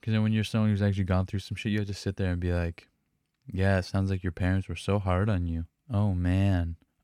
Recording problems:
none

